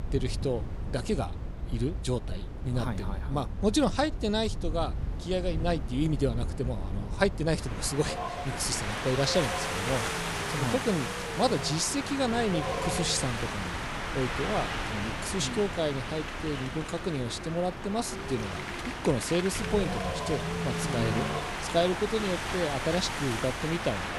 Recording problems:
wind in the background; loud; throughout; 3 dB below the speech

